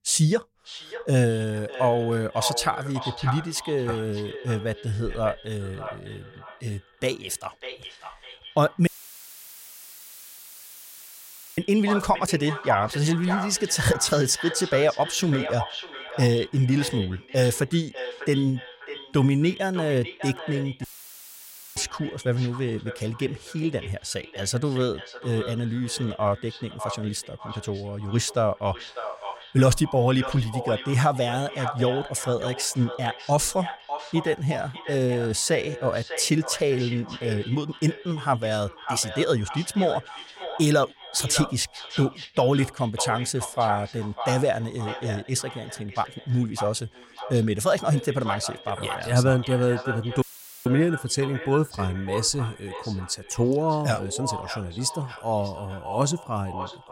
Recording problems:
echo of what is said; strong; throughout; 600 ms later, 10 dB below the speech
audio cutting out; filled with static; at 9 s for 2.5 s, at 21 s for 1 s and at 50 s

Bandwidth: 16 kHz